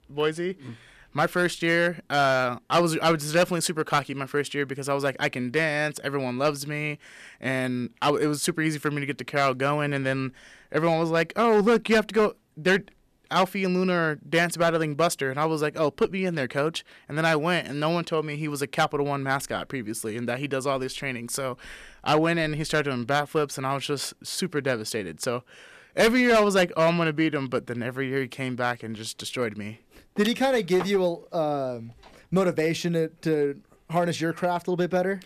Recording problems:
distortion; slight; 3% of the sound clipped

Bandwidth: 14.5 kHz